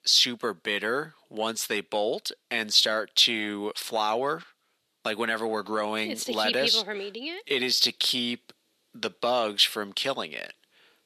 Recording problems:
thin; somewhat; fading below 300 Hz

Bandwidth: 13.5 kHz